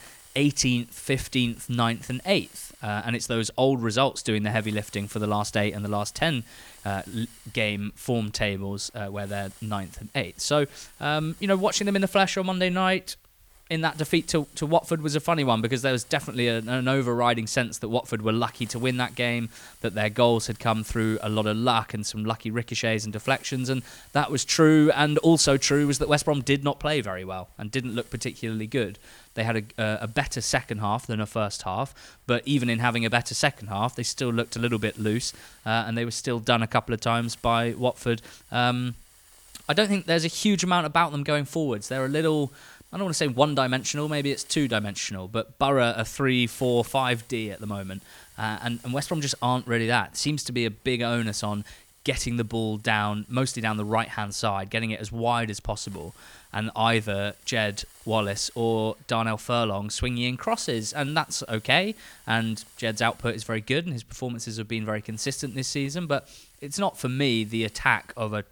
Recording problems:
hiss; faint; throughout; 25 dB below the speech

